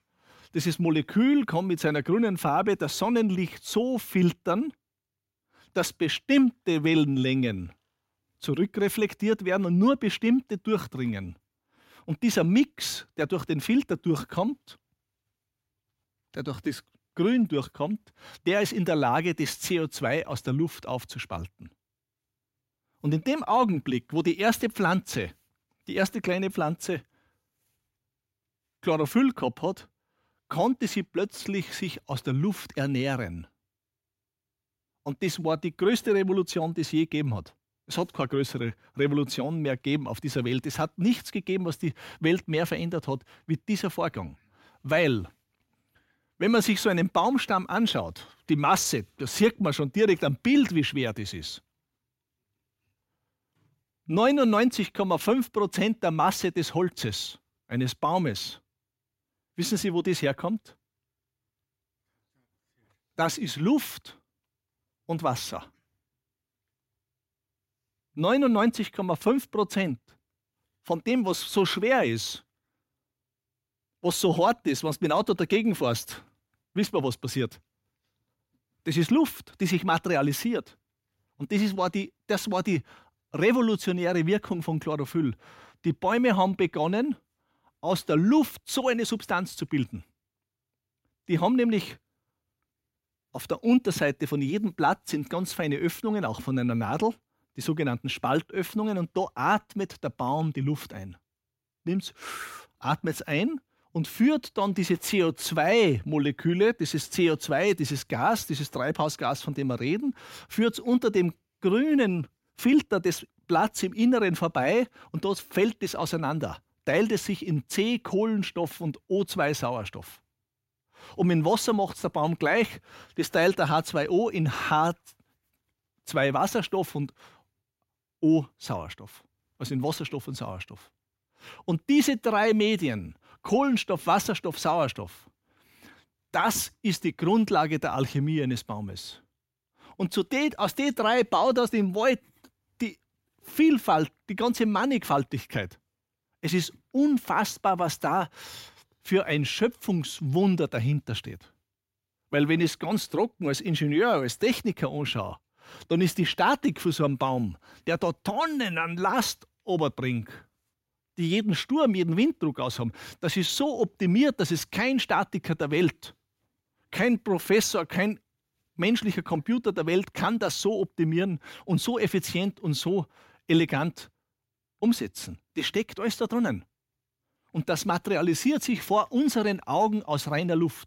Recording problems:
none

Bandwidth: 16 kHz